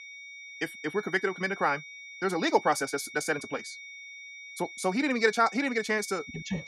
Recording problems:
wrong speed, natural pitch; too fast; 1.7 times normal speed
high-pitched whine; noticeable; throughout; 2 kHz, 15 dB below the speech

